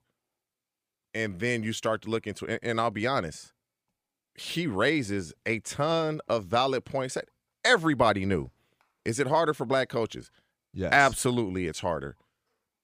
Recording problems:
none

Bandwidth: 15 kHz